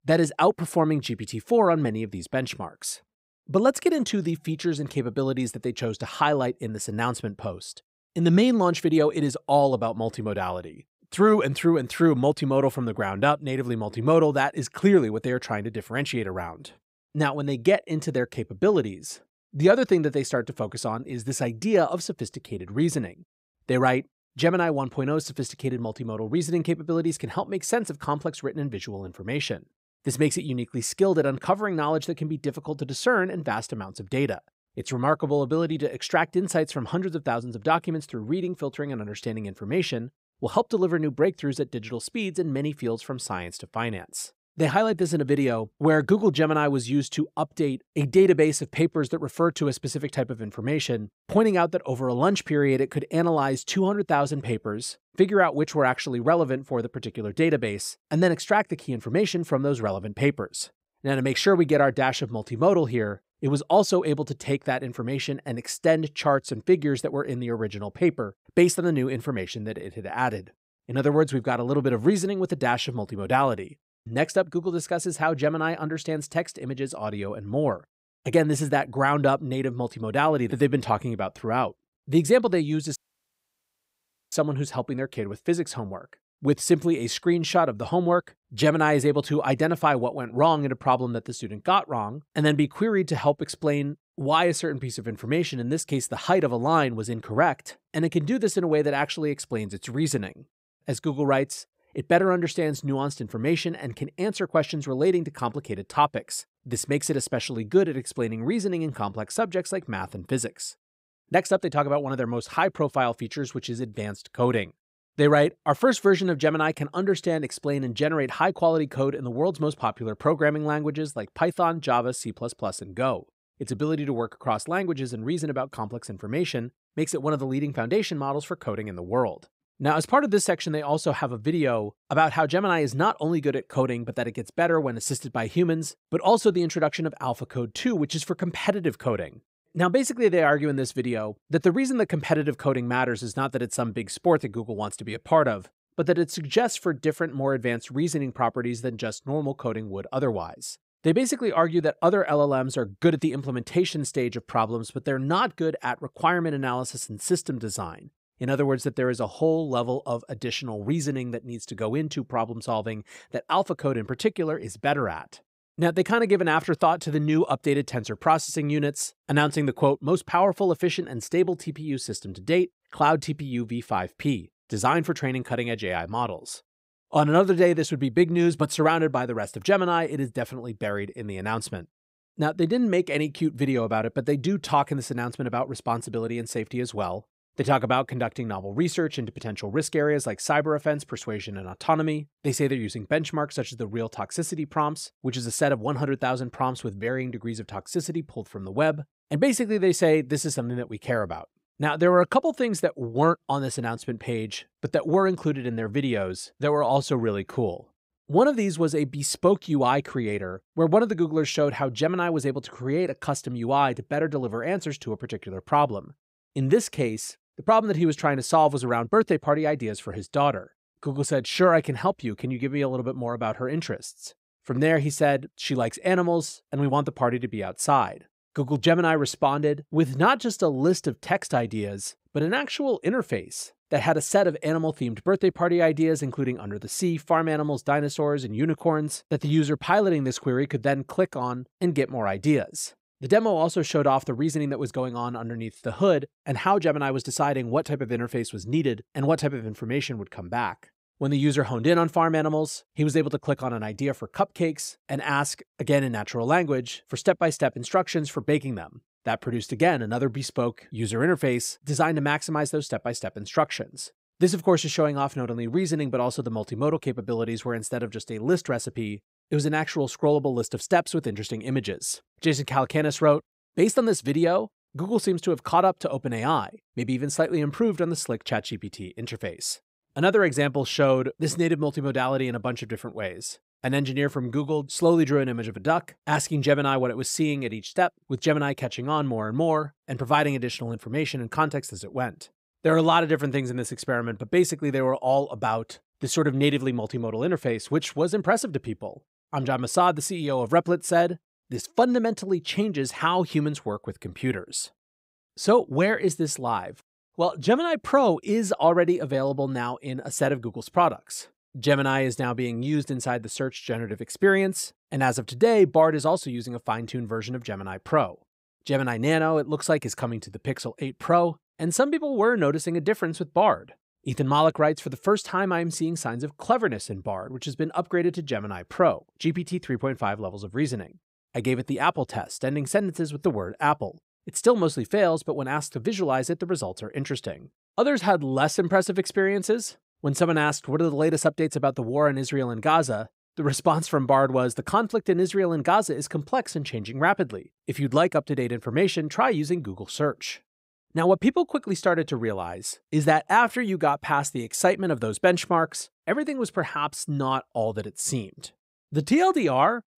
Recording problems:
audio cutting out; at 1:23 for 1.5 s

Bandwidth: 15.5 kHz